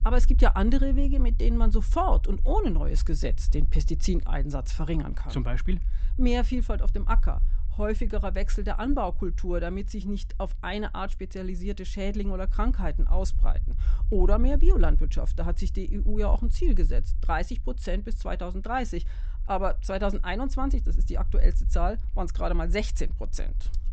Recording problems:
high frequencies cut off; noticeable; nothing above 8 kHz
low rumble; faint; throughout; 20 dB below the speech

